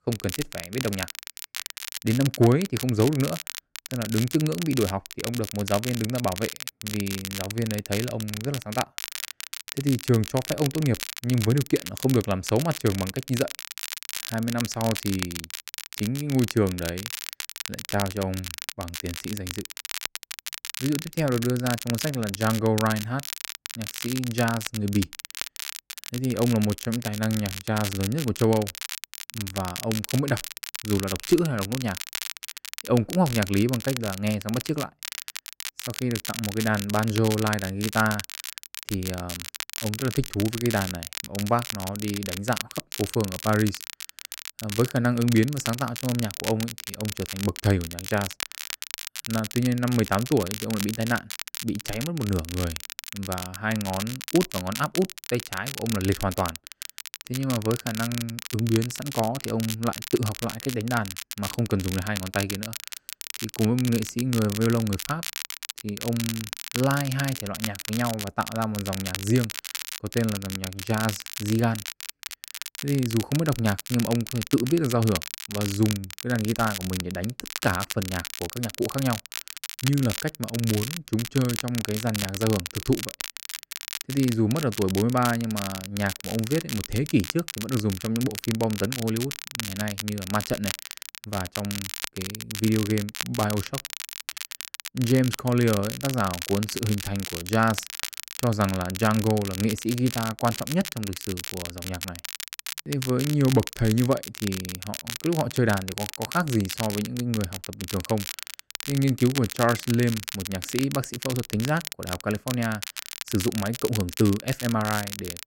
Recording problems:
crackle, like an old record; loud; 7 dB below the speech

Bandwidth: 16 kHz